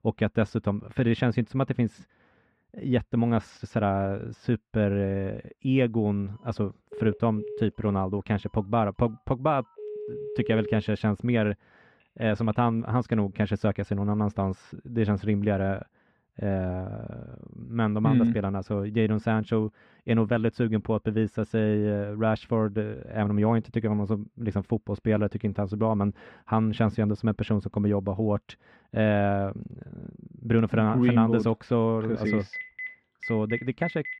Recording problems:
muffled; slightly; fading above 2.5 kHz
phone ringing; noticeable; from 6.5 to 12 s and from 32 s on; peak 8 dB below the speech

